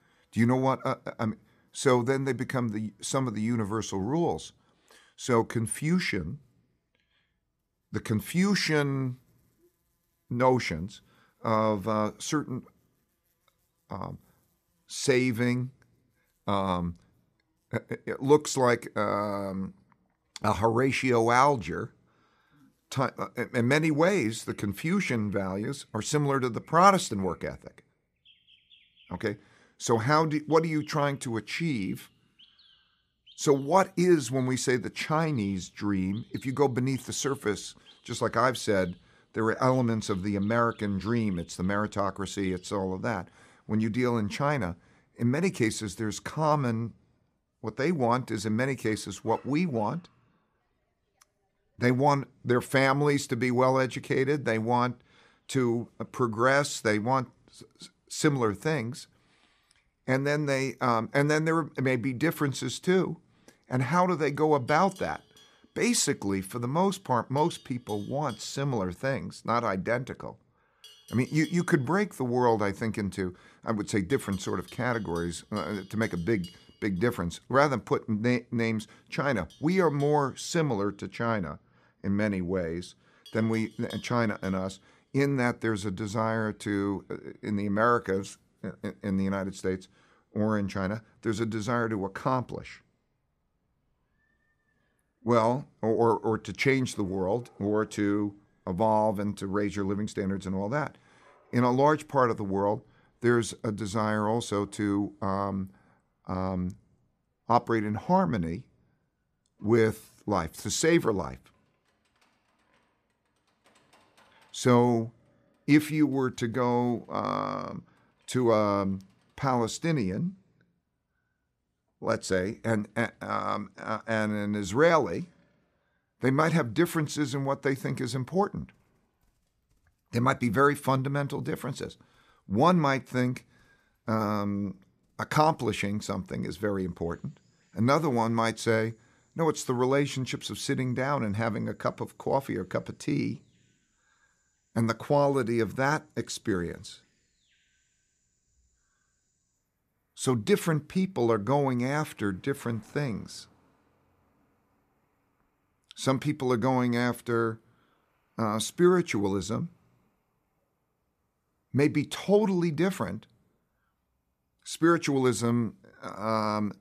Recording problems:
animal sounds; faint; throughout; 30 dB below the speech

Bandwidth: 14.5 kHz